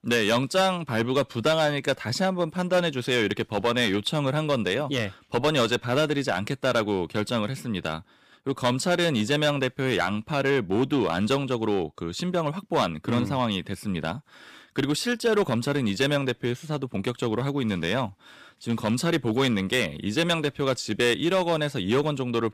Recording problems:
distortion; slight; 4% of the sound clipped

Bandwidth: 15 kHz